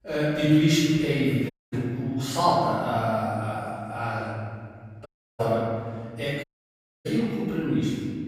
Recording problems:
room echo; strong; dies away in 1.9 s
off-mic speech; far
audio cutting out; at 1.5 s, at 5 s and at 6.5 s for 0.5 s

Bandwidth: 15 kHz